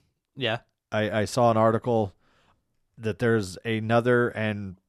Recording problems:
none

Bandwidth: 13.5 kHz